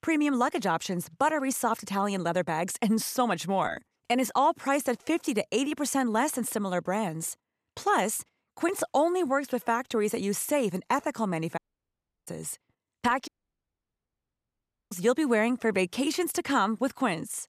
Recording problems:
audio cutting out; at 12 s for 0.5 s and at 13 s for 1.5 s

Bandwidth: 14.5 kHz